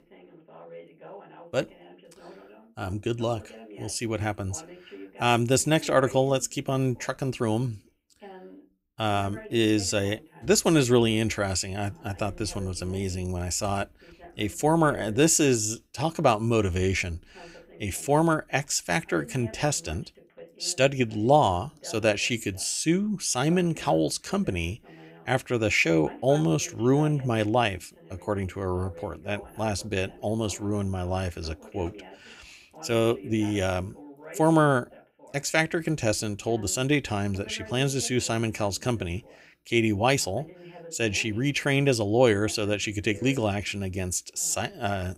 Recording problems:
voice in the background; faint; throughout; 20 dB below the speech

